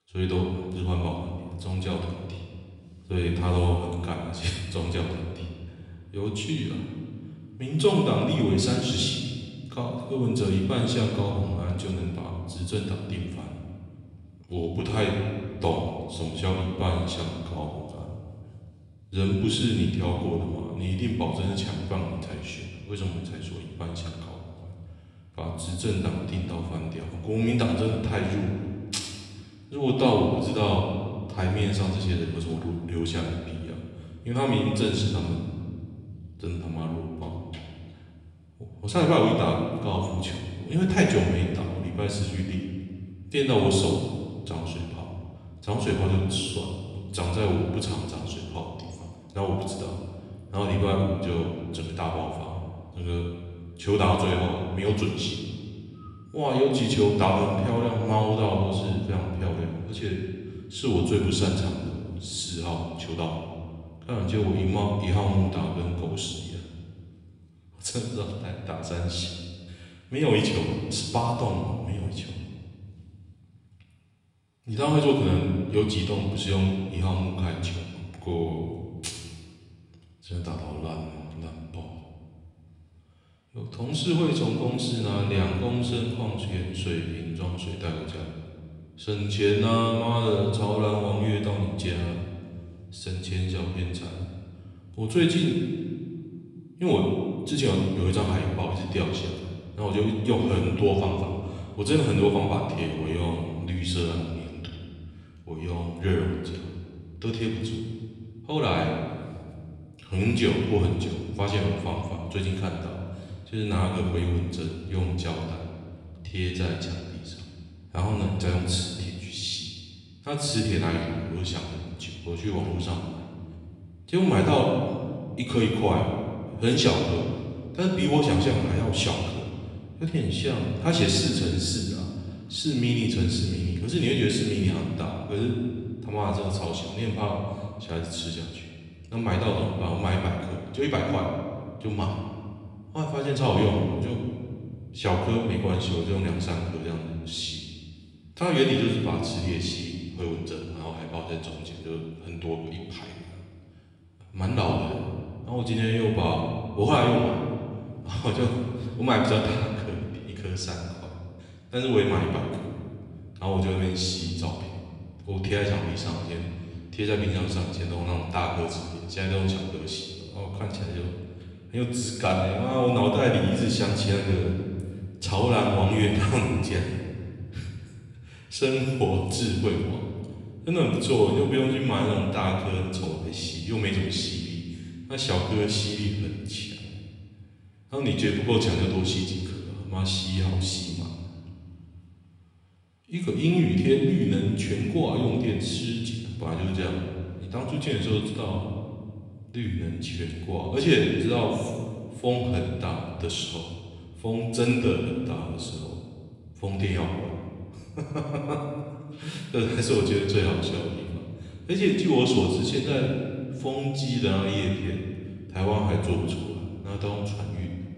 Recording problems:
room echo; noticeable; dies away in 1.6 s
off-mic speech; somewhat distant

